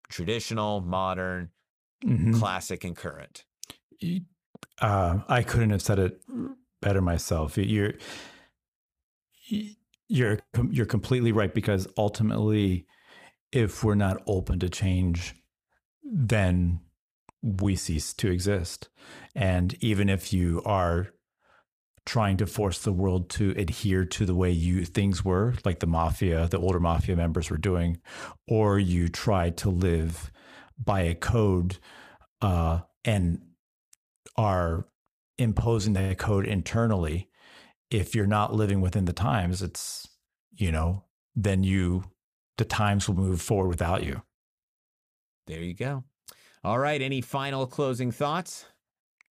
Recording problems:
none

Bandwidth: 15 kHz